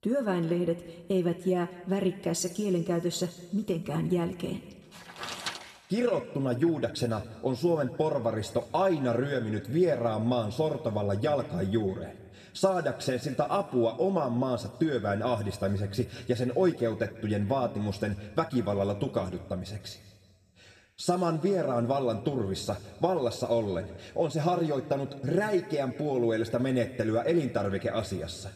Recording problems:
echo of what is said; faint; throughout; 200 ms later, 25 dB below the speech
room echo; slight; dies away in 1.3 s
off-mic speech; somewhat distant

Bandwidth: 14 kHz